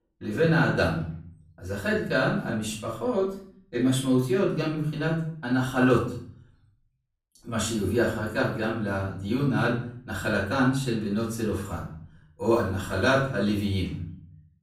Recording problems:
off-mic speech; far
room echo; noticeable; dies away in 0.5 s

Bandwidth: 15.5 kHz